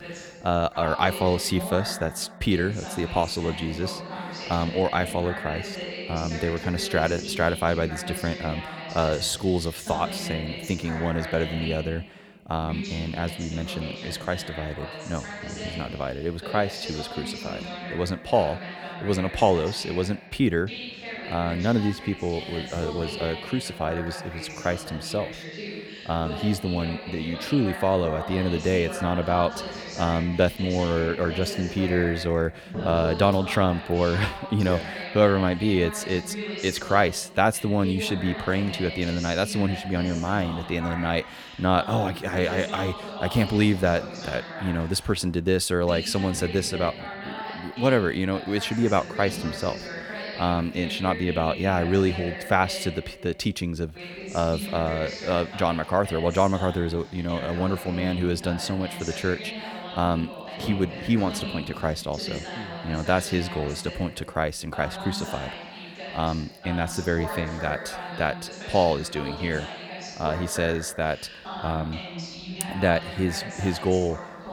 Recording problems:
voice in the background; loud; throughout; 9 dB below the speech

